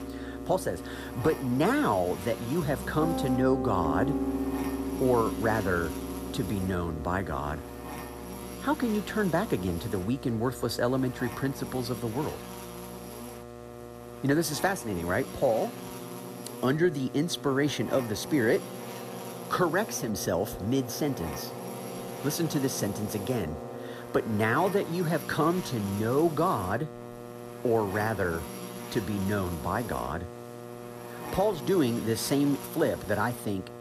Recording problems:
background music; loud; throughout; 10 dB below the speech
electrical hum; noticeable; throughout; 60 Hz, 10 dB below the speech
hiss; faint; throughout; 30 dB below the speech

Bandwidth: 14 kHz